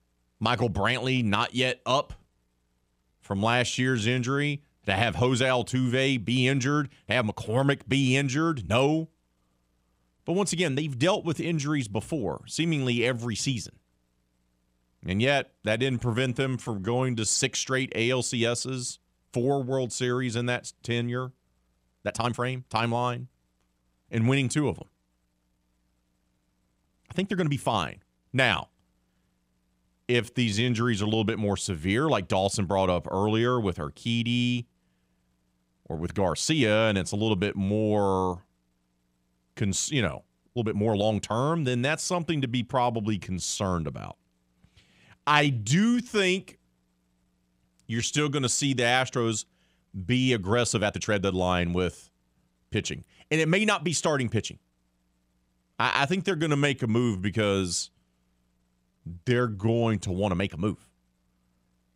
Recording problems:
uneven, jittery; strongly; from 3 s to 1:00

